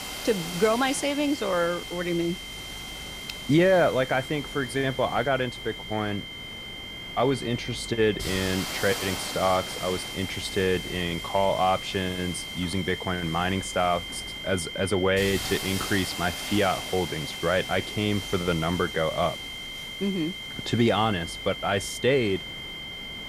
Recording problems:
high-pitched whine; loud; throughout; 3 kHz, 9 dB below the speech
hiss; noticeable; throughout; 10 dB below the speech

